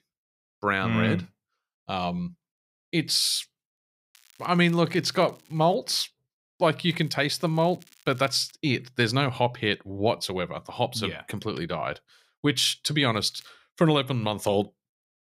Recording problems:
crackling; faint; from 4 to 5.5 s, from 7 to 8.5 s and at 13 s; 30 dB below the speech

